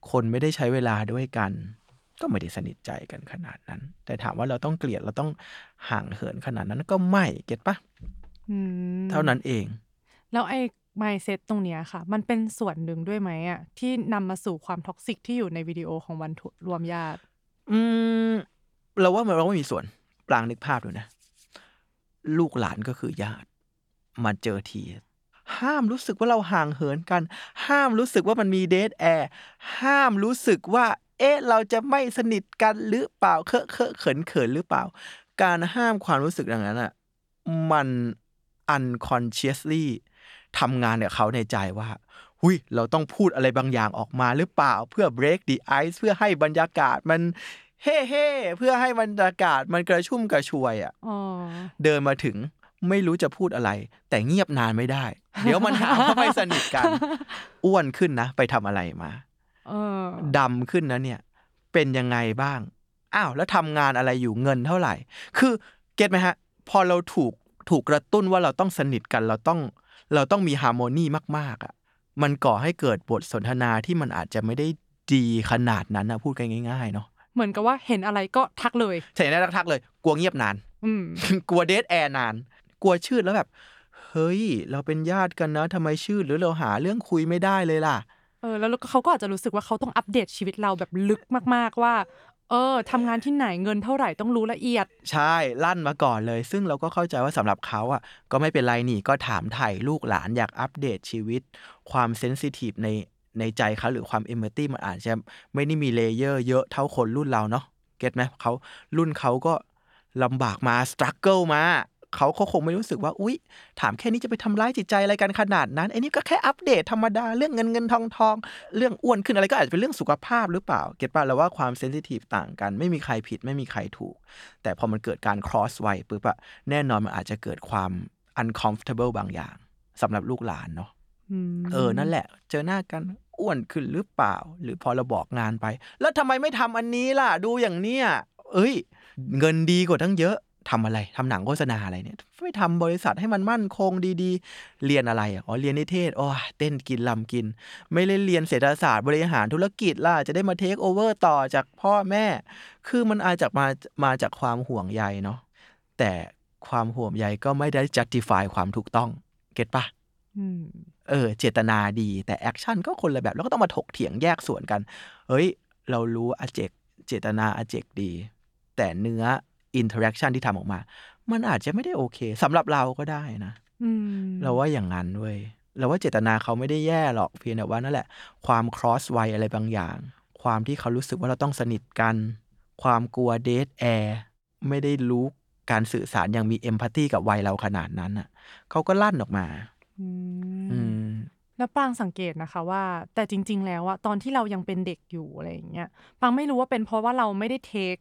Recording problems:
none

